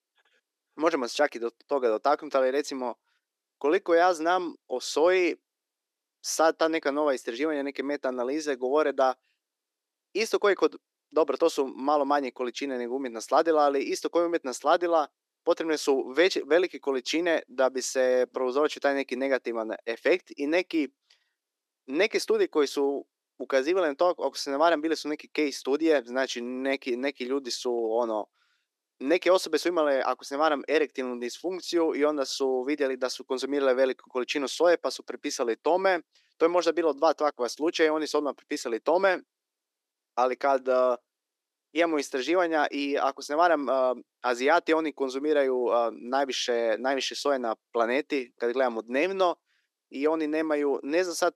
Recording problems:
thin; somewhat; fading below 300 Hz

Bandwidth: 13.5 kHz